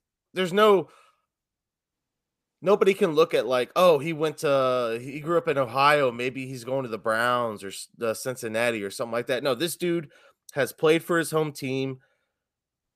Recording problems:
none

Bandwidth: 15 kHz